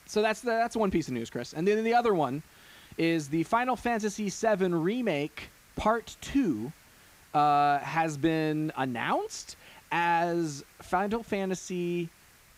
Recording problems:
hiss; faint; throughout; 25 dB below the speech

